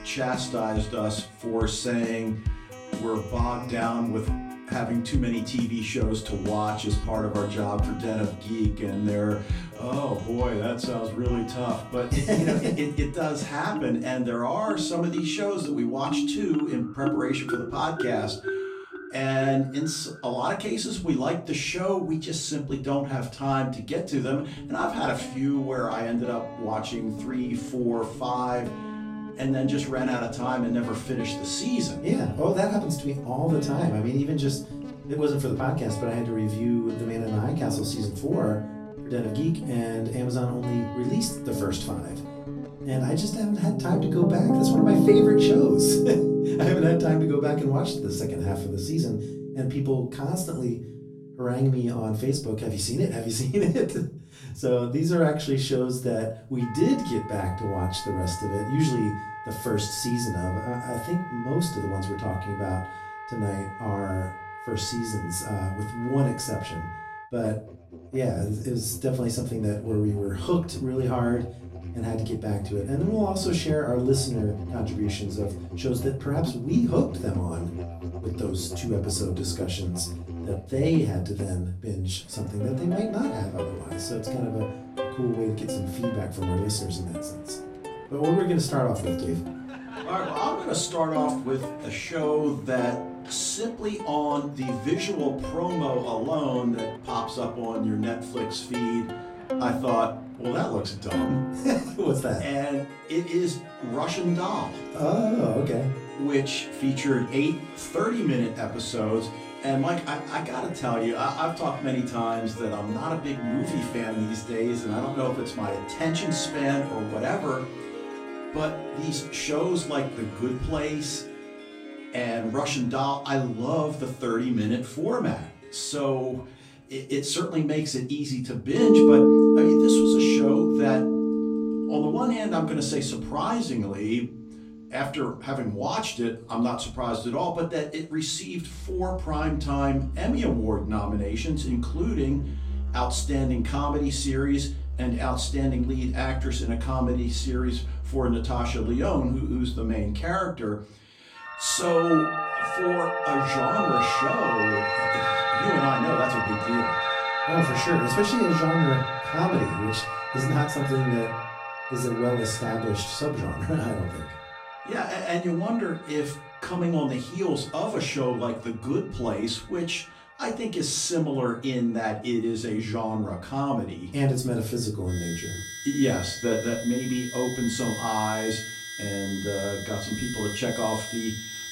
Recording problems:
off-mic speech; far
room echo; slight; dies away in 0.3 s
background music; loud; throughout; 3 dB below the speech

